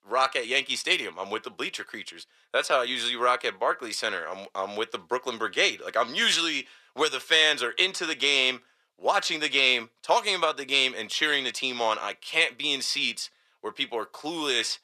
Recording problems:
thin; somewhat; fading below 500 Hz

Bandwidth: 14 kHz